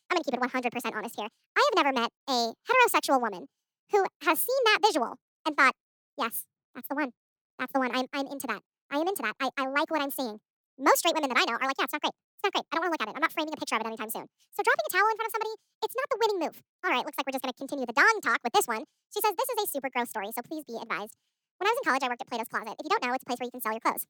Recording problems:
wrong speed and pitch; too fast and too high; 1.6 times normal speed

